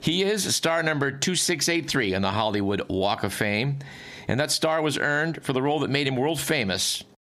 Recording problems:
squashed, flat; somewhat

